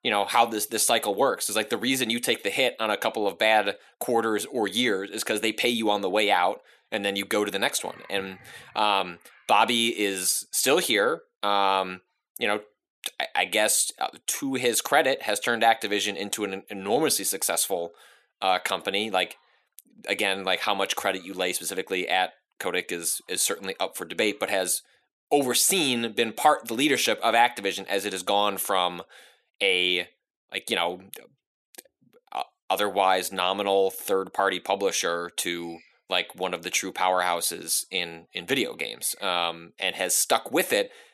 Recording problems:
thin; somewhat; fading below 300 Hz

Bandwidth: 14 kHz